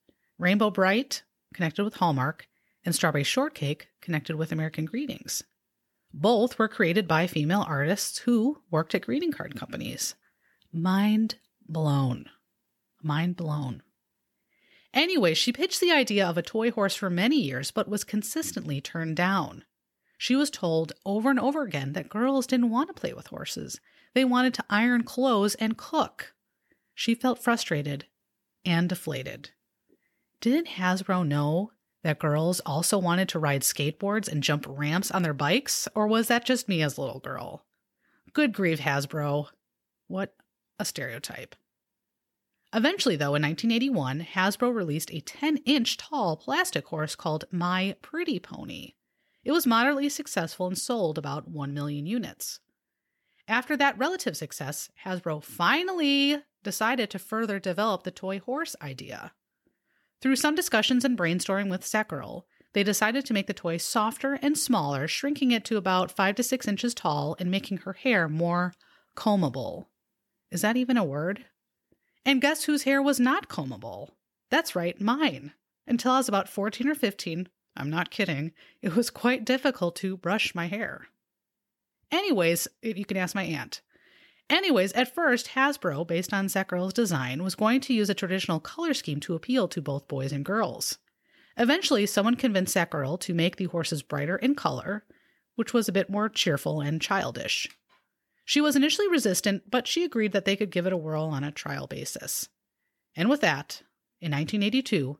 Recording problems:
none

